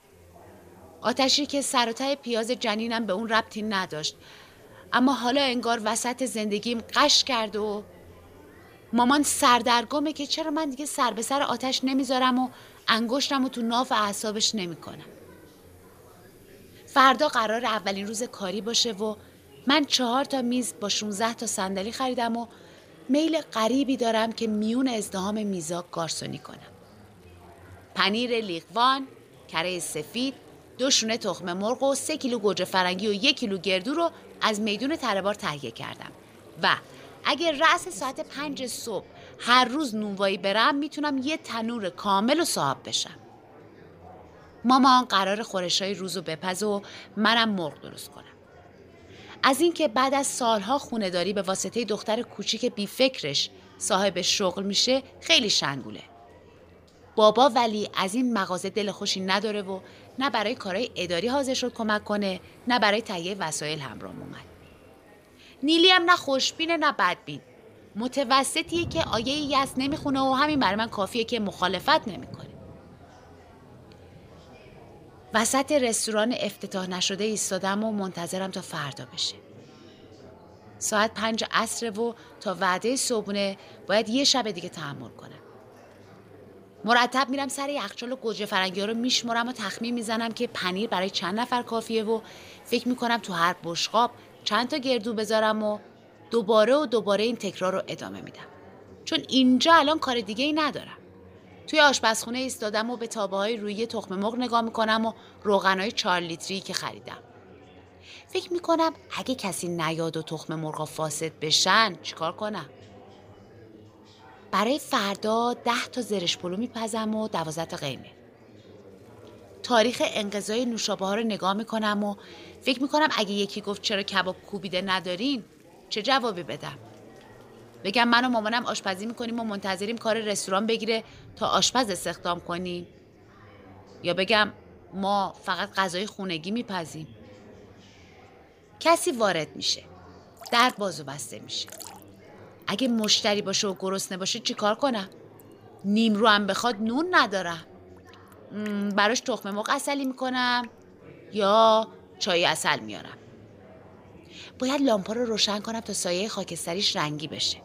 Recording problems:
rain or running water; faint; throughout; 30 dB below the speech
chatter from many people; faint; throughout; 25 dB below the speech

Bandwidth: 15 kHz